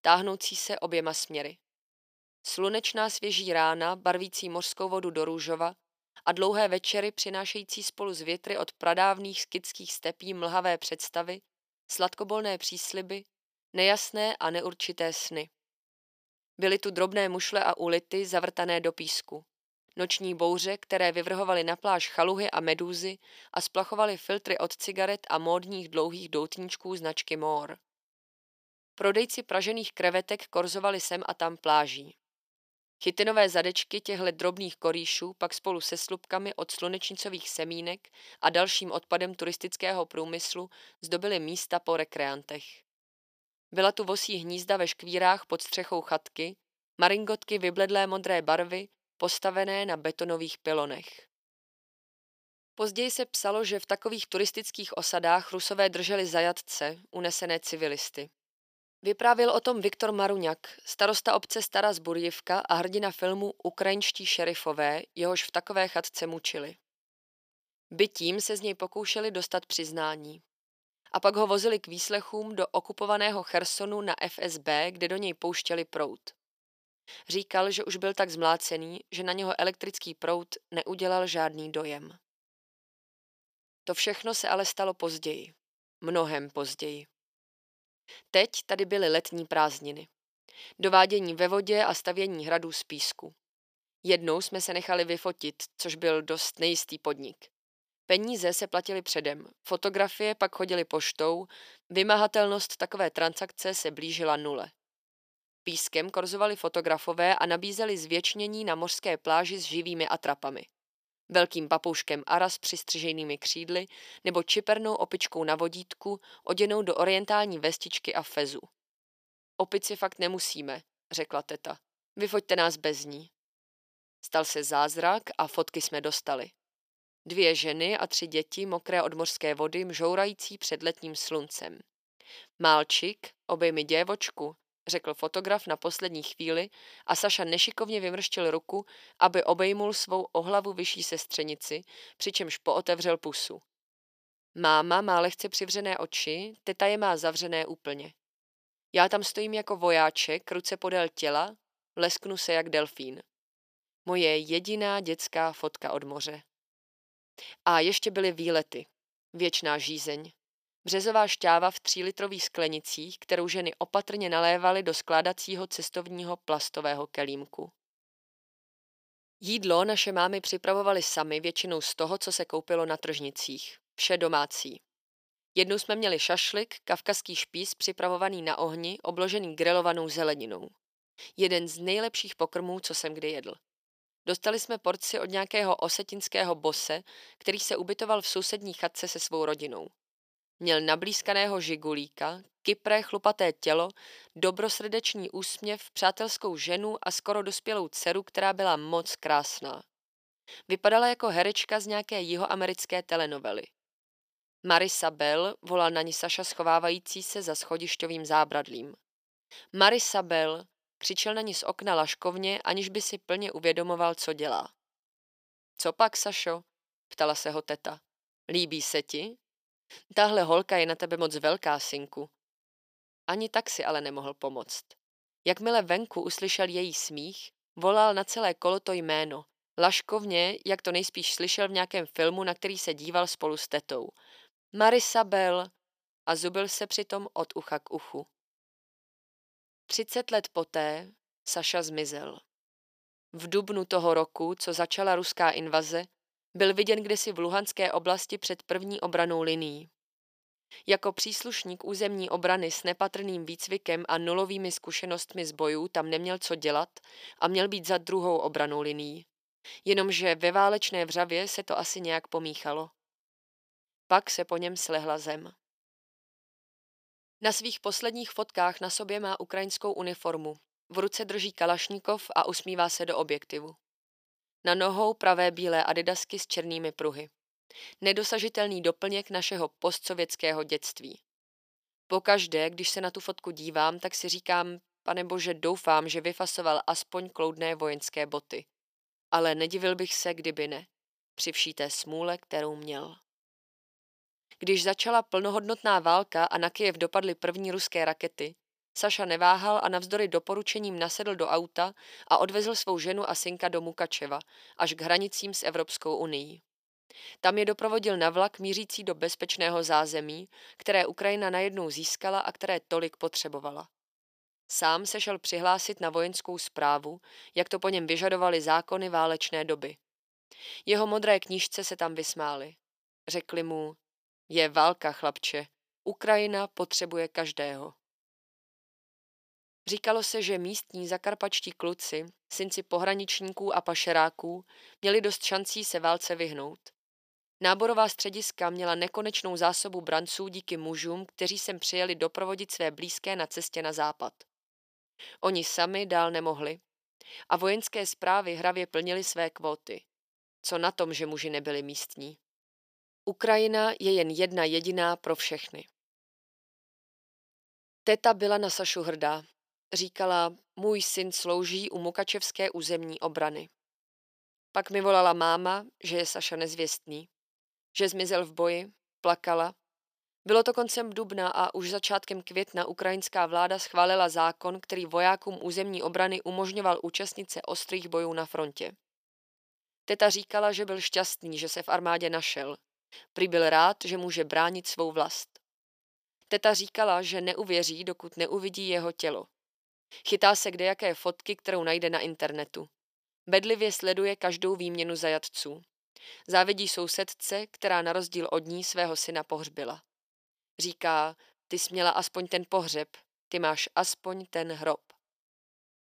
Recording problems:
thin; somewhat; fading below 350 Hz

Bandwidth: 15 kHz